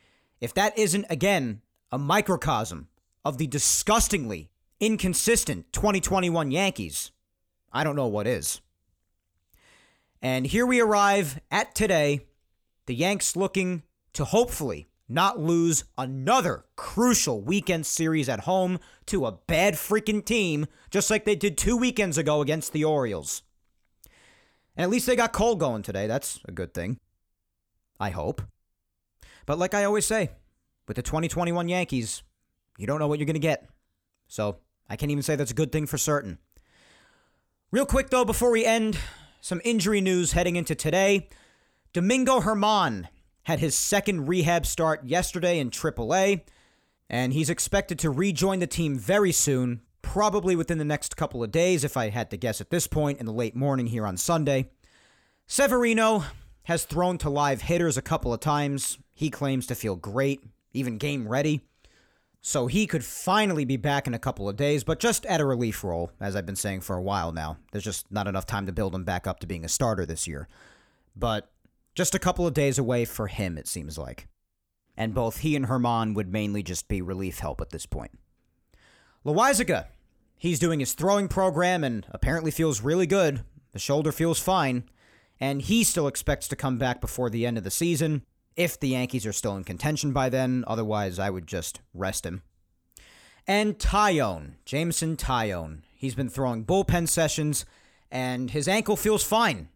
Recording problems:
none

